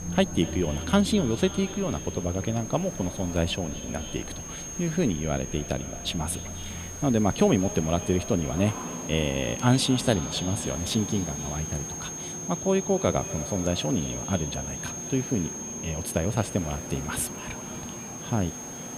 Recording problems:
echo of what is said; noticeable; throughout; 240 ms later, 15 dB below the speech
high-pitched whine; loud; throughout; 6.5 kHz, 9 dB below the speech
traffic noise; noticeable; throughout; 15 dB below the speech
hiss; faint; throughout; 20 dB below the speech

